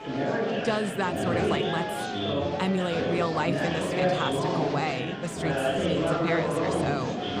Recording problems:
murmuring crowd; very loud; throughout; 3 dB above the speech
high-pitched whine; faint; throughout; 2.5 kHz, 30 dB below the speech

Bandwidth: 15 kHz